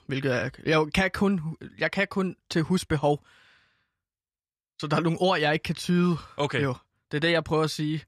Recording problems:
none

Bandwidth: 13.5 kHz